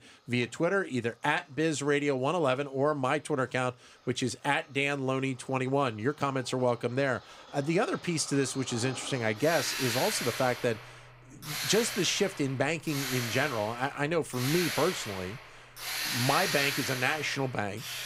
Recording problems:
machinery noise; loud; throughout; 5 dB below the speech

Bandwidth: 15.5 kHz